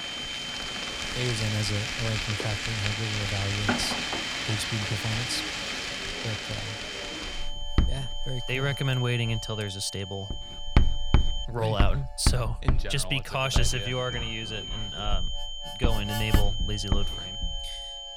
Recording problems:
household noises; very loud; throughout; as loud as the speech
high-pitched whine; loud; until 11 s and from 13 s on; 3 kHz, 5 dB below the speech
background music; noticeable; throughout; 15 dB below the speech

